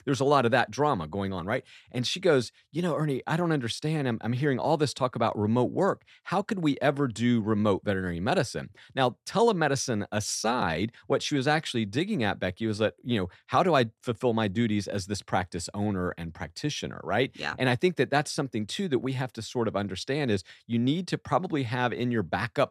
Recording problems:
none

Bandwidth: 14 kHz